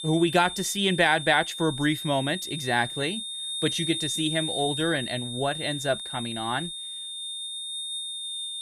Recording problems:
high-pitched whine; loud; throughout; 3.5 kHz, 5 dB below the speech

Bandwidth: 14.5 kHz